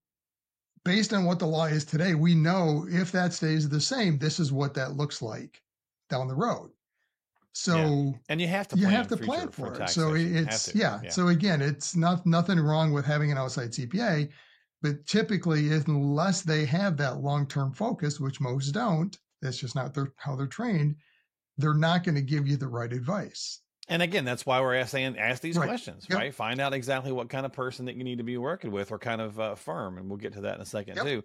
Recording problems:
none

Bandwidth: 16 kHz